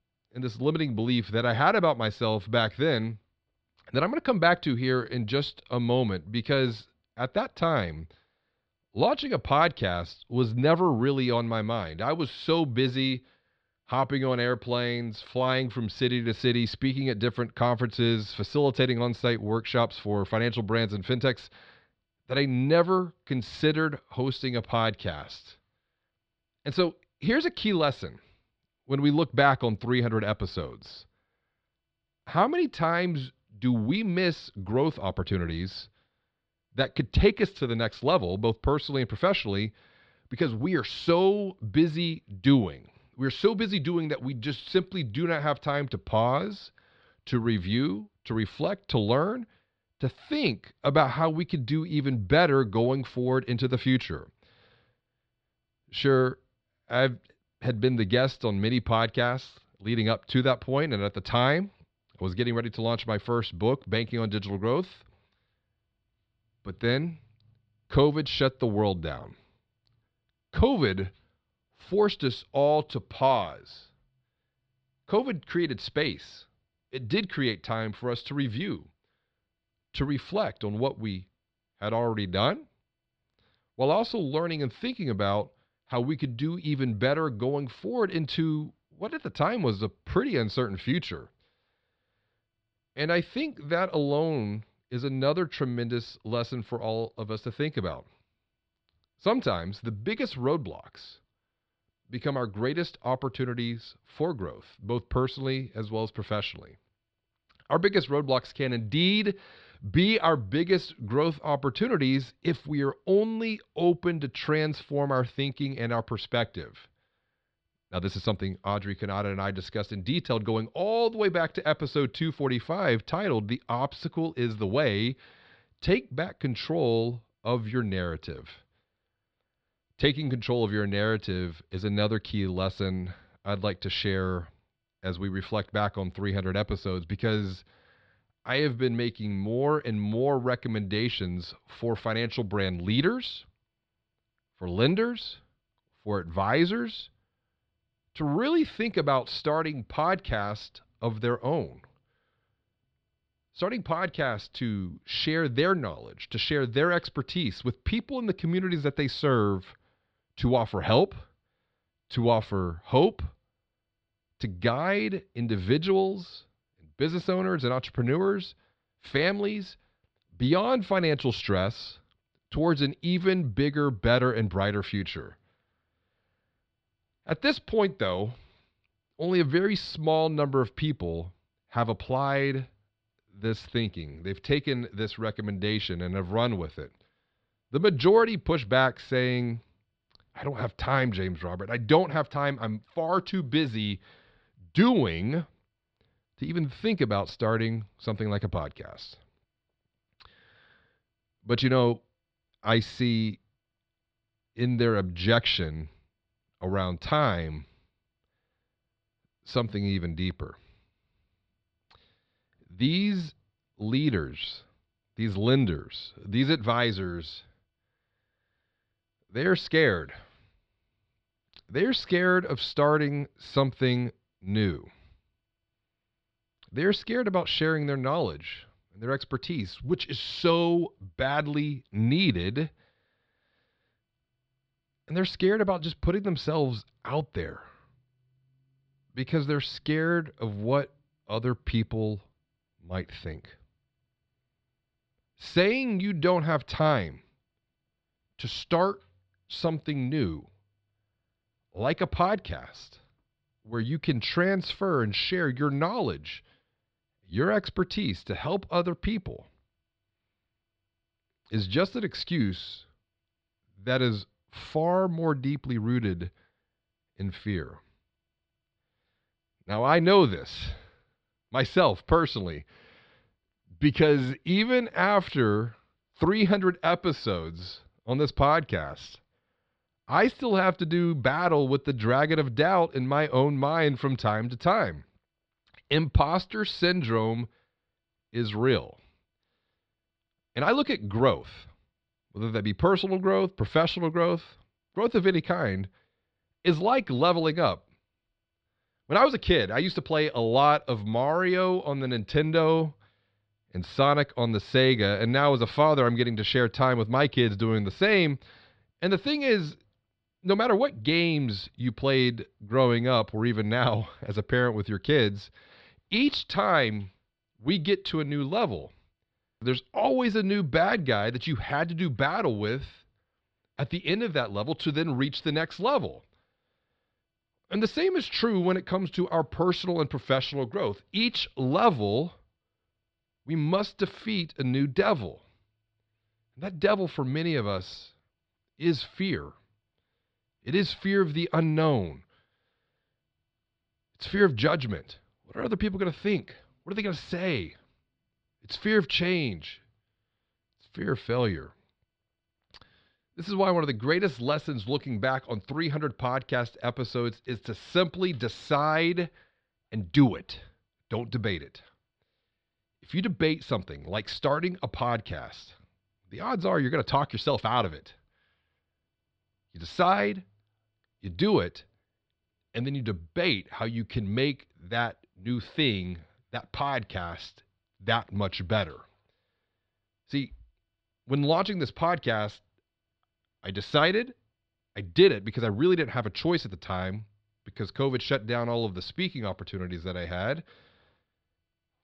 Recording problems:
muffled; very slightly; fading above 4 kHz

